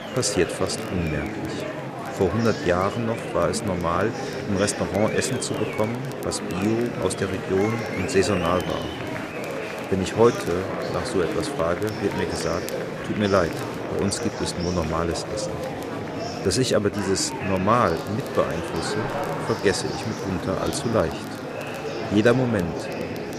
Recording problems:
murmuring crowd; loud; throughout; 5 dB below the speech
crackle, like an old record; faint; 25 dB below the speech

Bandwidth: 14.5 kHz